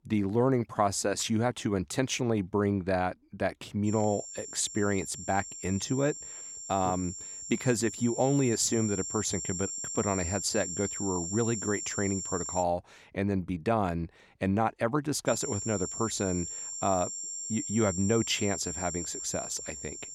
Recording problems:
high-pitched whine; loud; from 4 to 13 s and from 15 s on; 7.5 kHz, 6 dB below the speech

